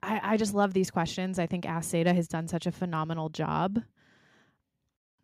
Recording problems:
none

